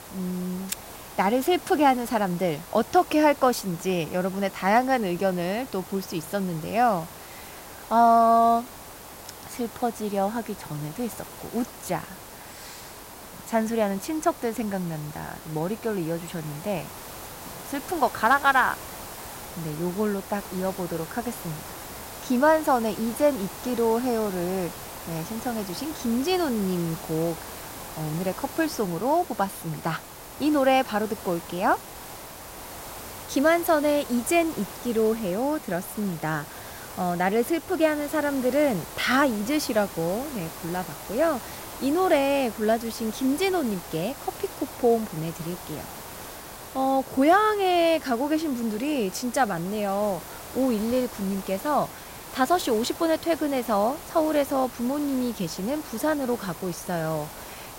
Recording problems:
hiss; noticeable; throughout; 15 dB below the speech

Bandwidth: 16 kHz